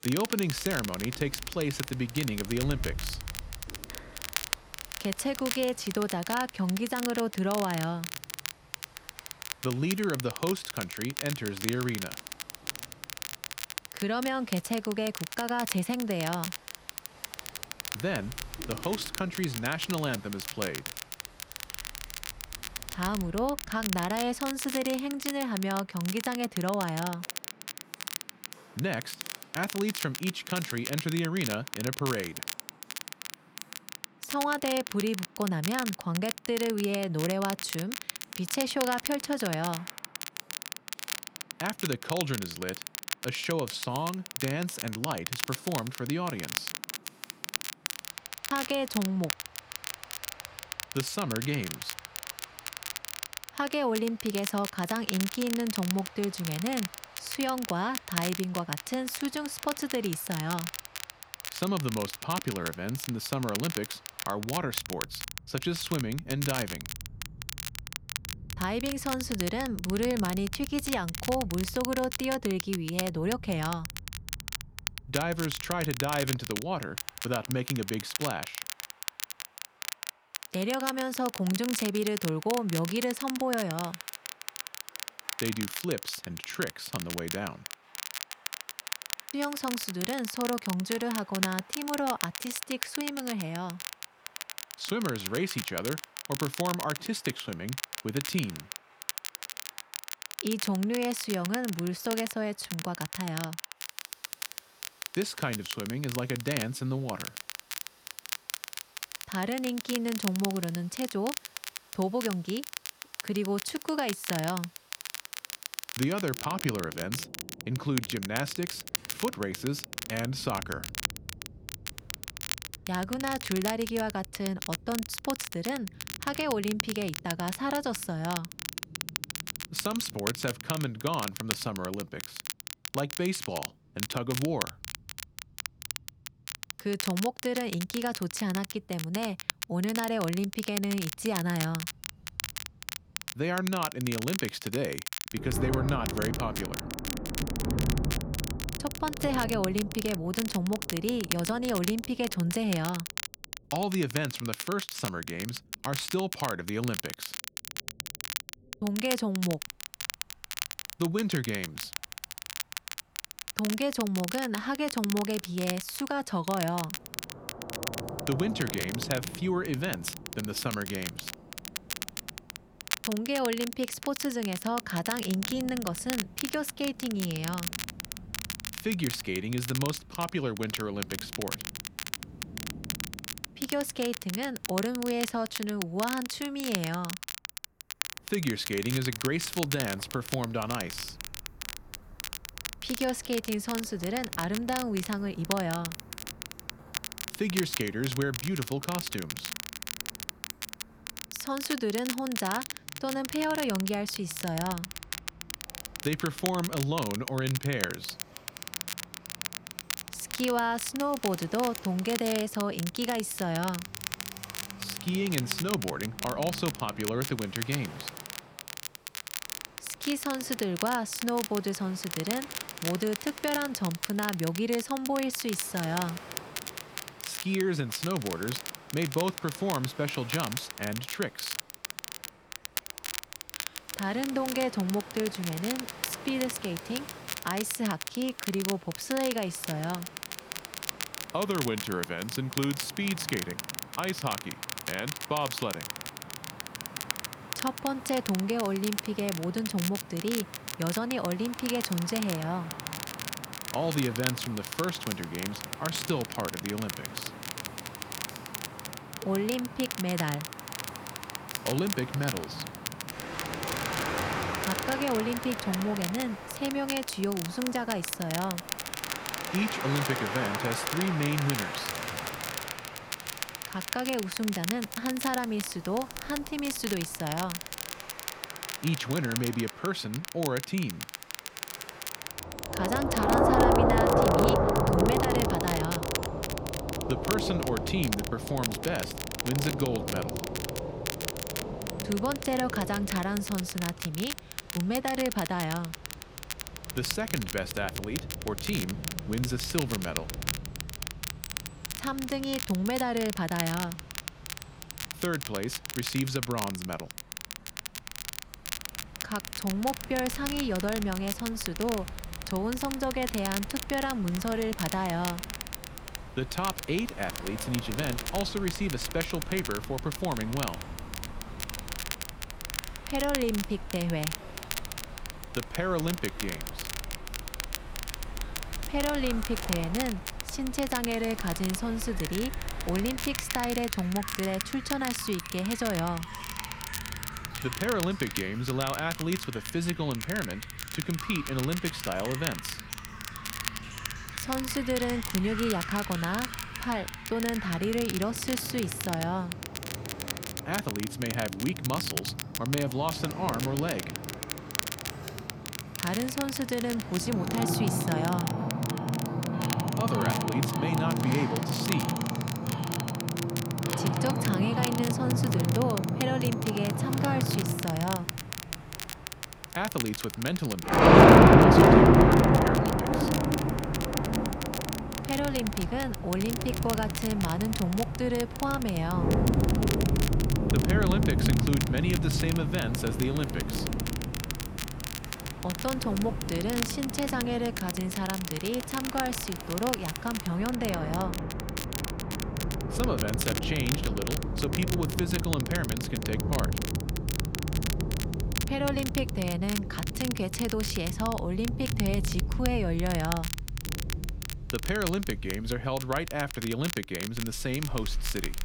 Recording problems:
rain or running water; very loud; throughout; as loud as the speech
crackle, like an old record; loud; 5 dB below the speech

